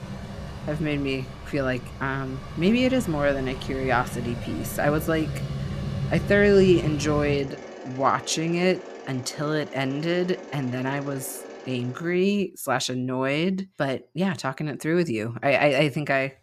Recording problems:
machinery noise; loud; until 12 s; 10 dB below the speech

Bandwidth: 14.5 kHz